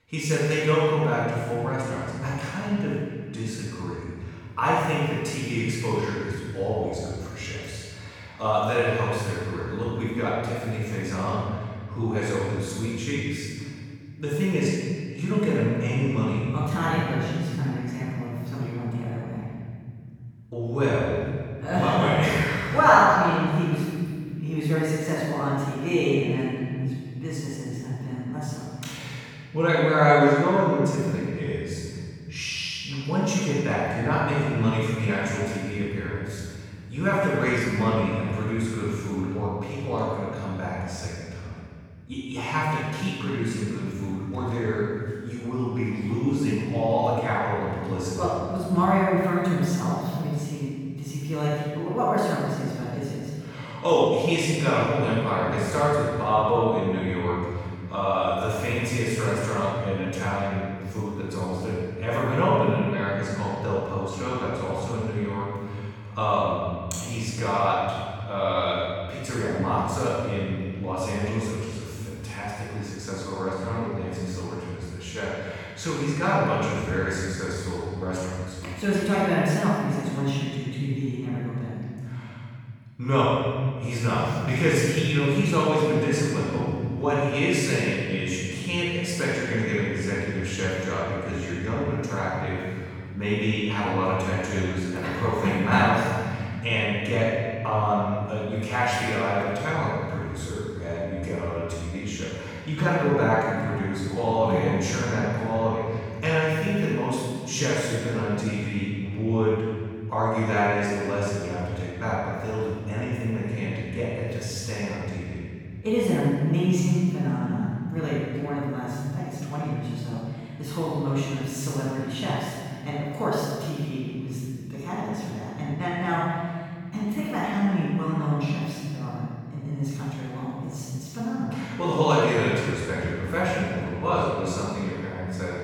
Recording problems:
room echo; strong; dies away in 2.5 s
off-mic speech; far

